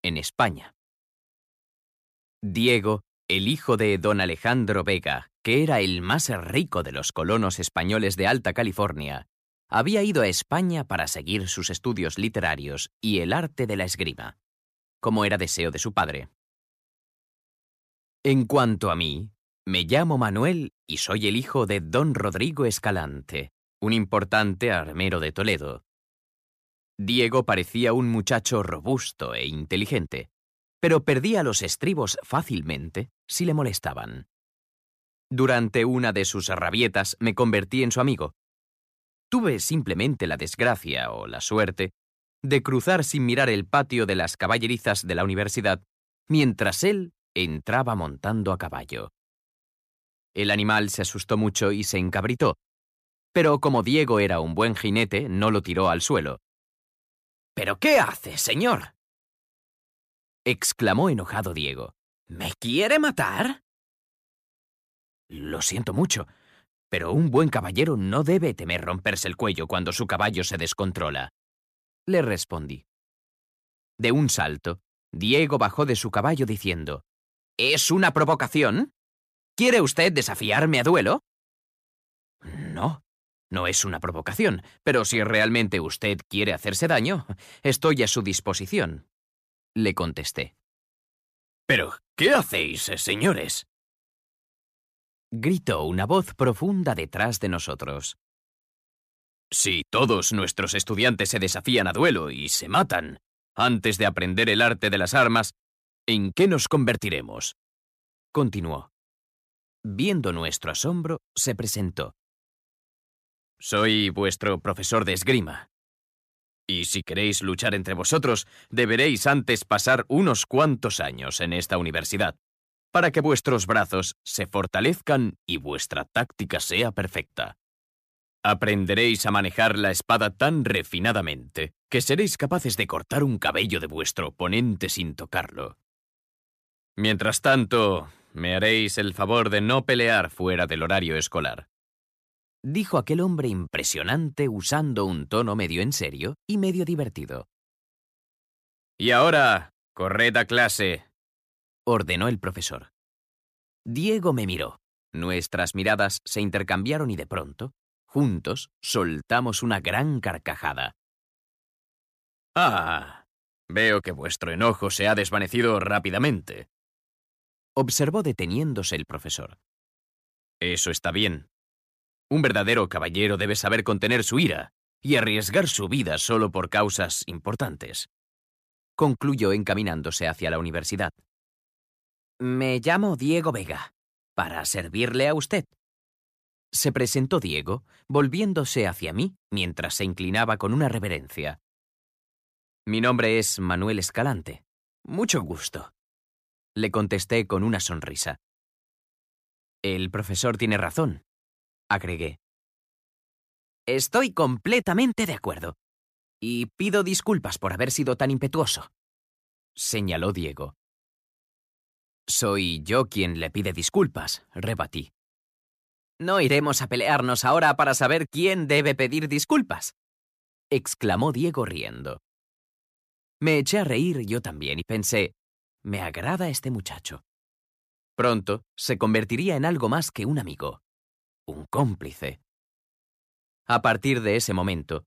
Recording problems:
none

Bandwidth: 14.5 kHz